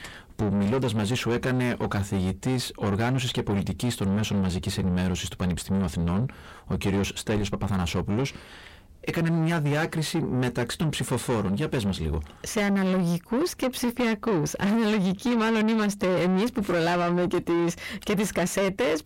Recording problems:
distortion; heavy; 7 dB below the speech

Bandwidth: 16 kHz